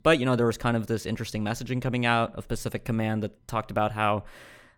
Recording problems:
none

